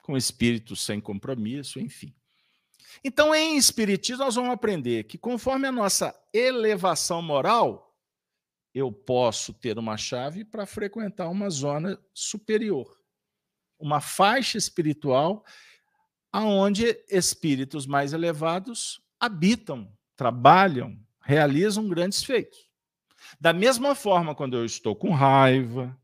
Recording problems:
none

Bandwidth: 15 kHz